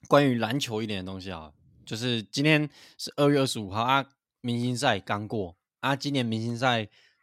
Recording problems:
none

